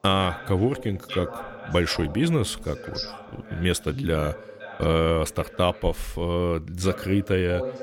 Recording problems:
voice in the background; noticeable; throughout; 15 dB below the speech

